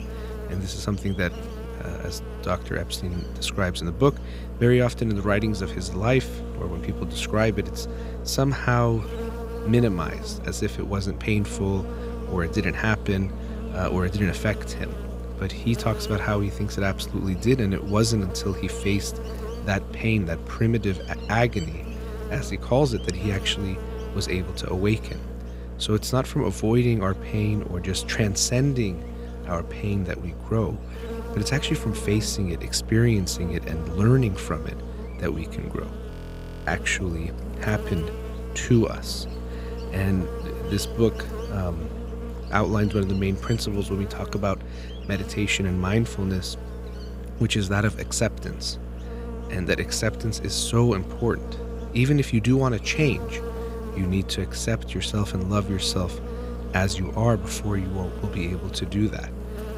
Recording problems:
electrical hum; noticeable; throughout; 60 Hz, 10 dB below the speech
audio freezing; at 36 s for 0.5 s

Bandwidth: 15.5 kHz